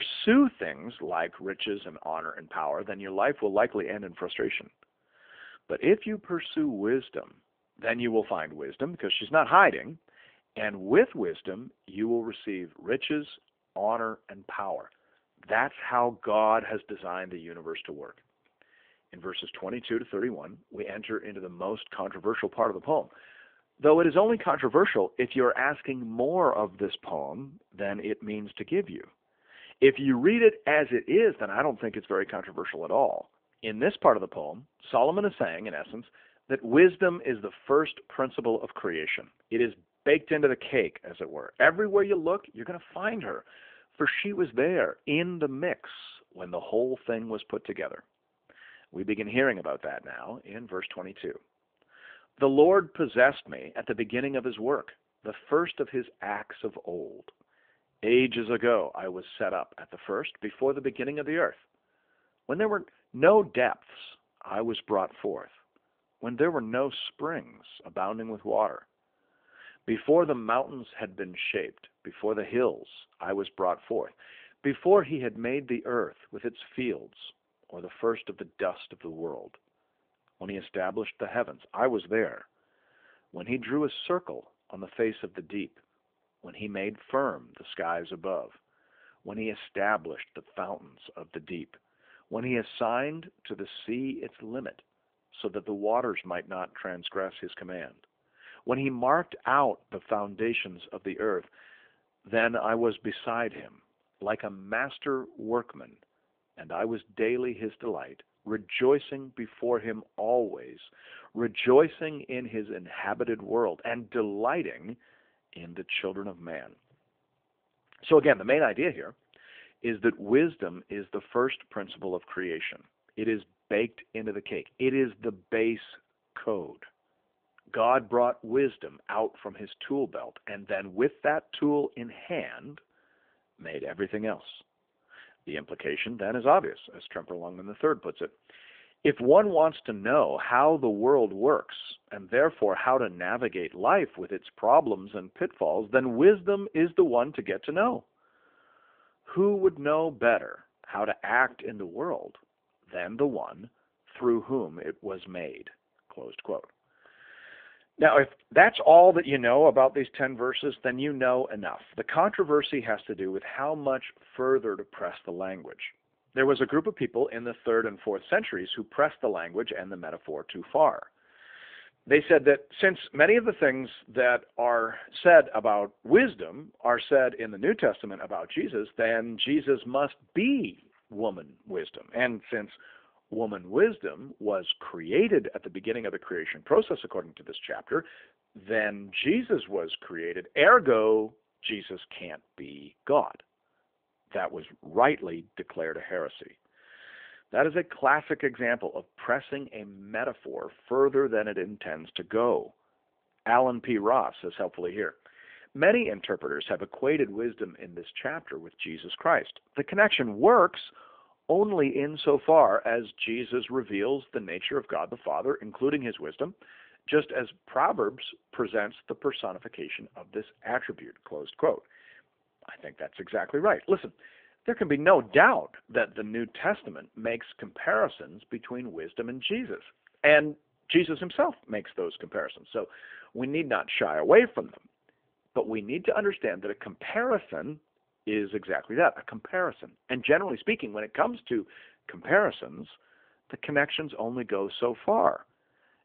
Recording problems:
phone-call audio
abrupt cut into speech; at the start

